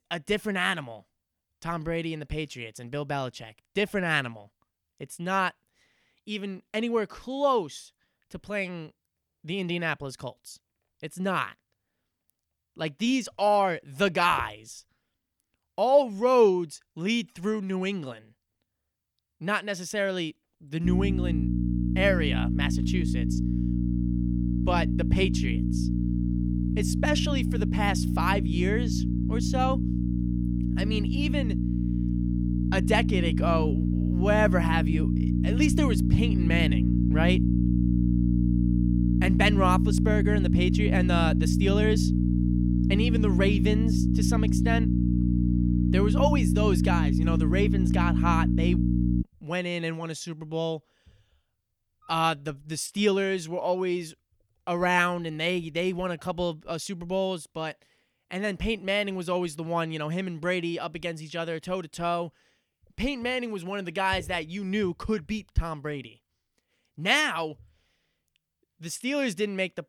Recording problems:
electrical hum; loud; from 21 to 49 s; 60 Hz, 5 dB below the speech

